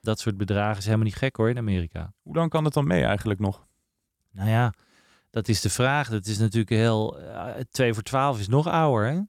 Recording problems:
none

